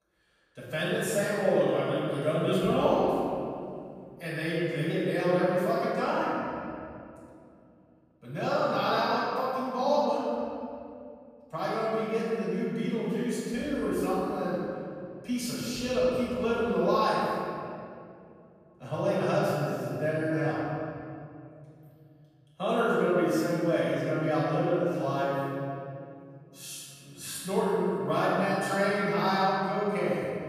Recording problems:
room echo; strong; dies away in 2.5 s
off-mic speech; far

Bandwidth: 14.5 kHz